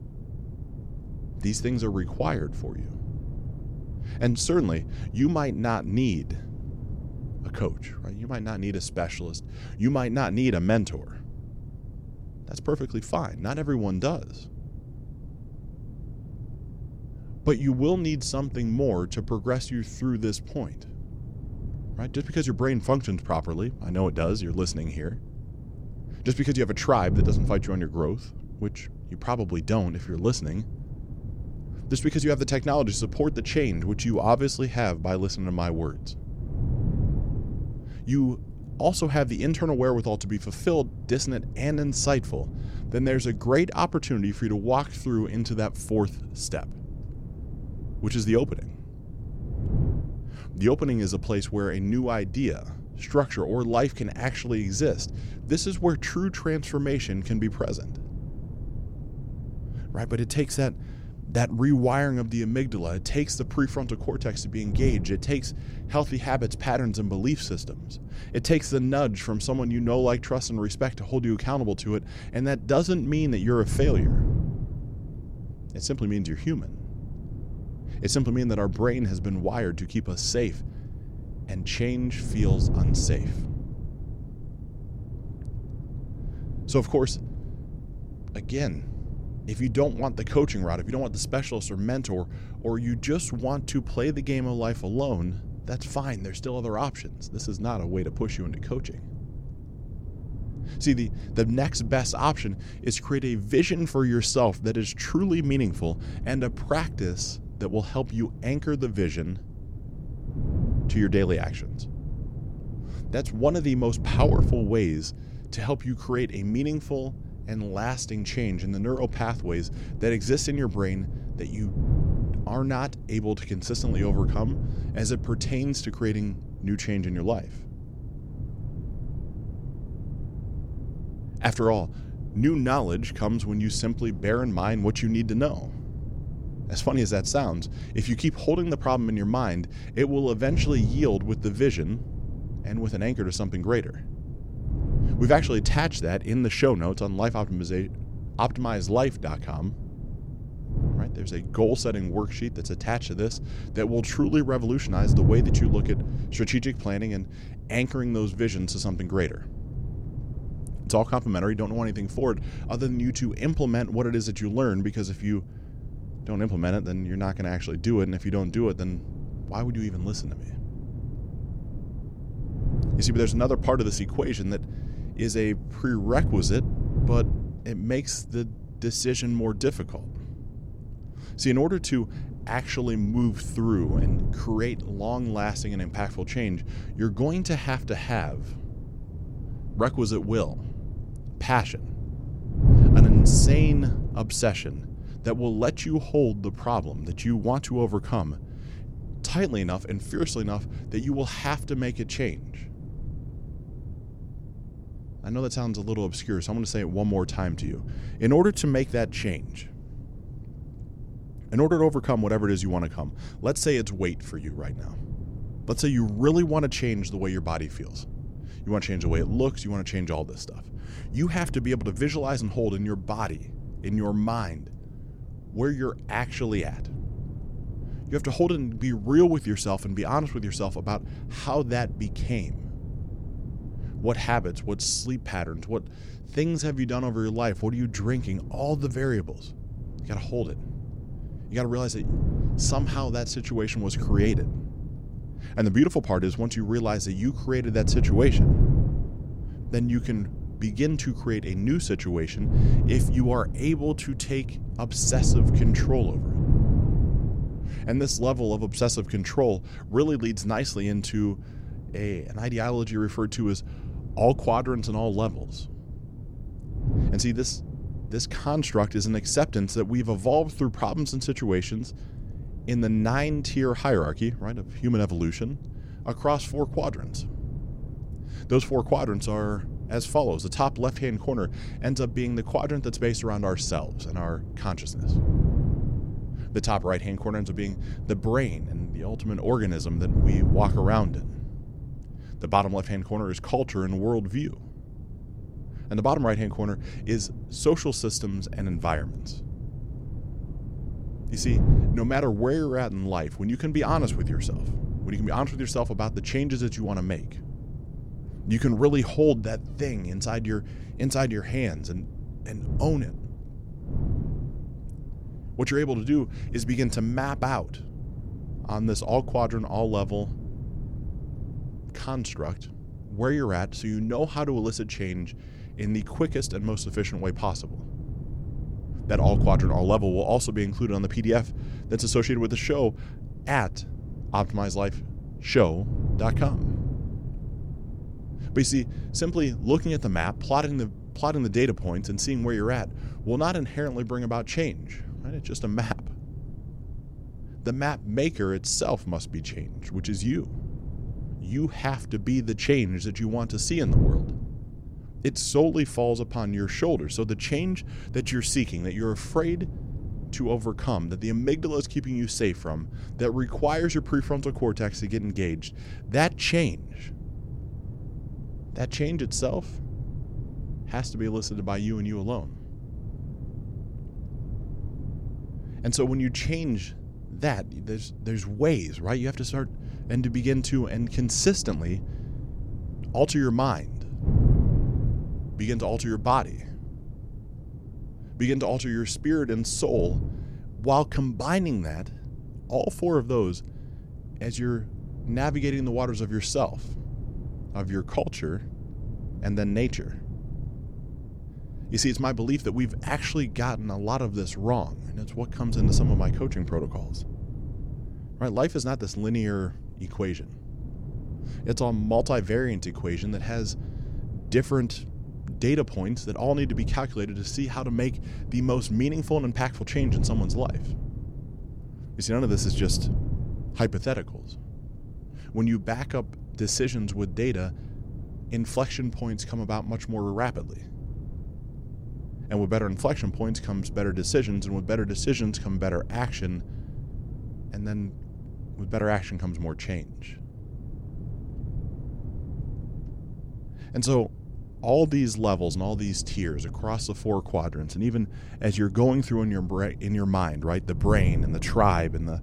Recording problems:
wind noise on the microphone; occasional gusts; 15 dB below the speech

